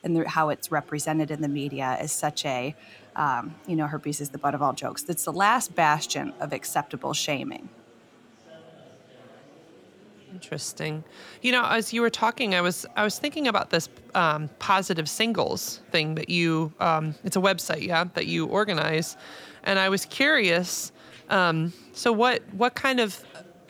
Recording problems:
murmuring crowd; faint; throughout; 25 dB below the speech

